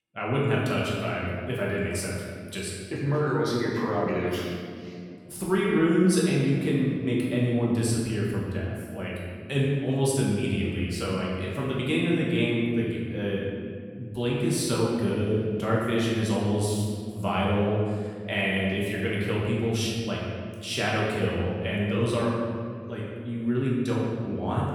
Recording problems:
room echo; strong; dies away in 2 s
off-mic speech; far

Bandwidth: 18 kHz